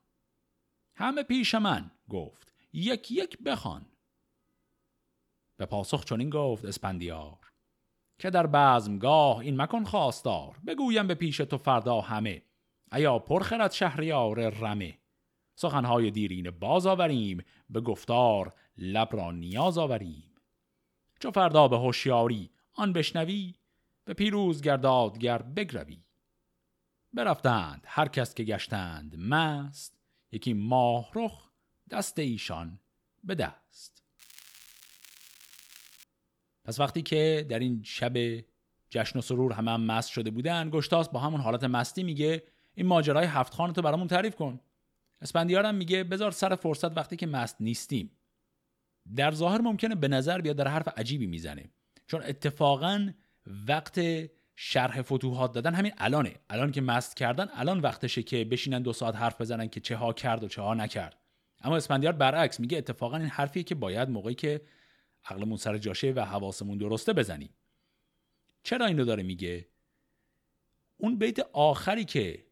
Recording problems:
crackling; faint; at 20 s and from 34 to 36 s, mostly in the pauses; 25 dB below the speech

